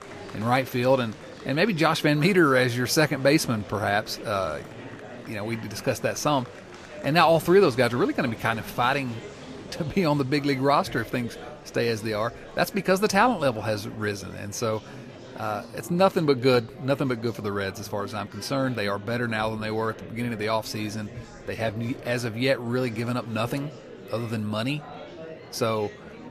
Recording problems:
murmuring crowd; noticeable; throughout; 15 dB below the speech

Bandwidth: 14.5 kHz